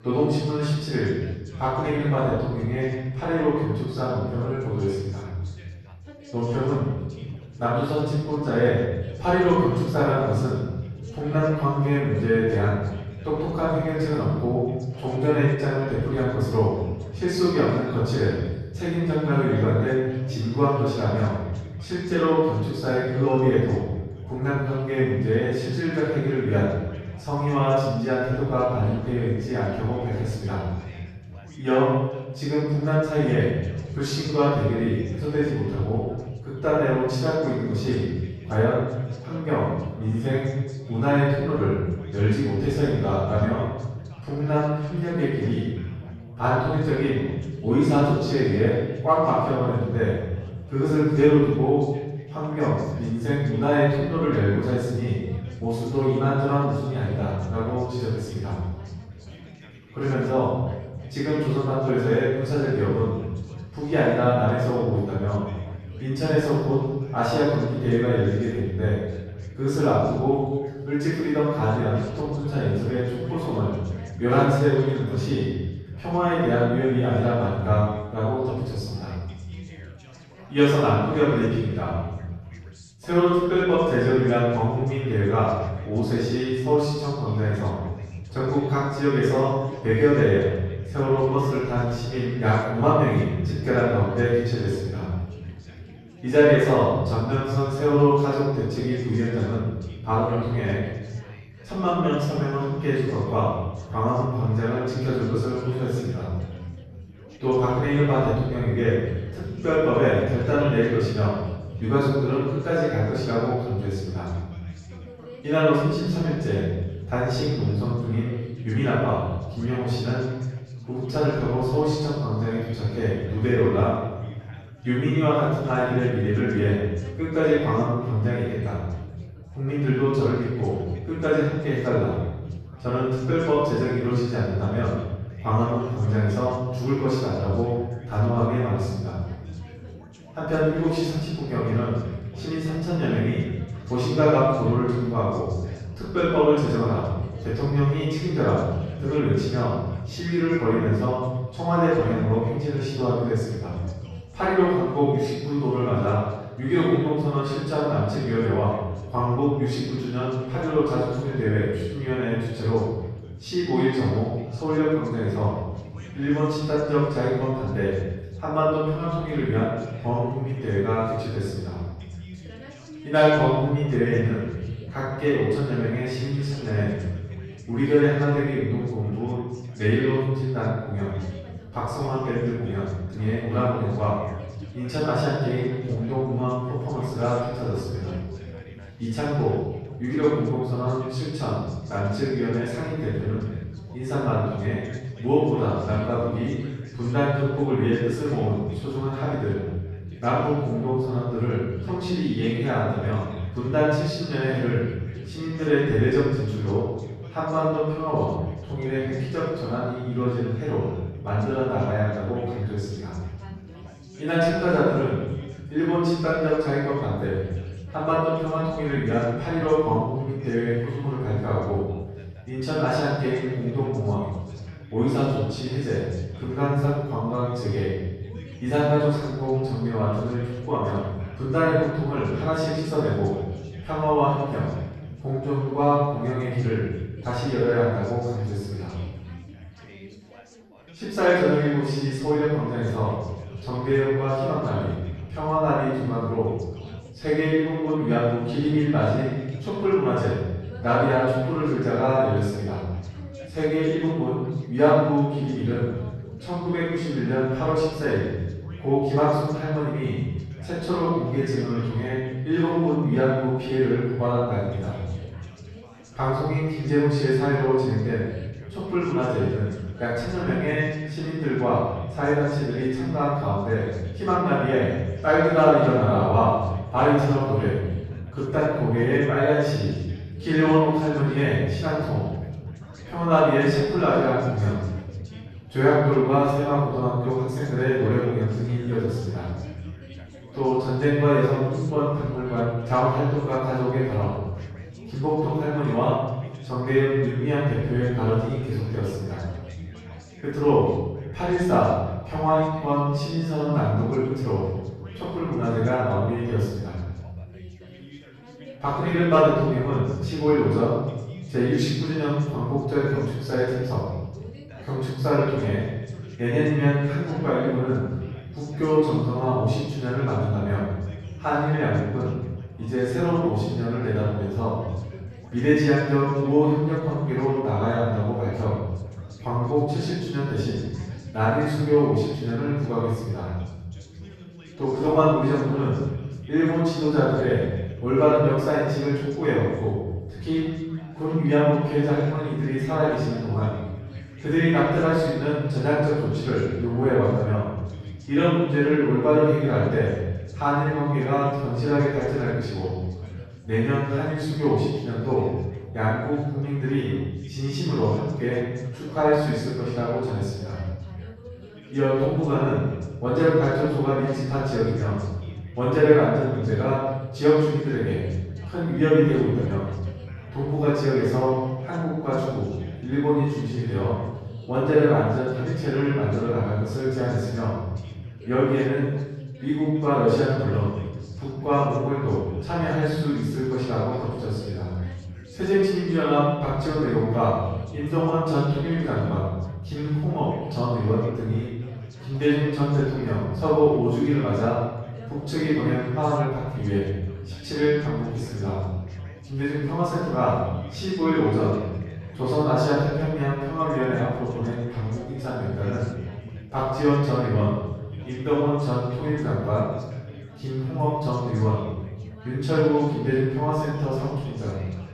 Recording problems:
room echo; strong; dies away in 1.4 s
off-mic speech; far
background chatter; faint; throughout; 4 voices, 20 dB below the speech

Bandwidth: 13.5 kHz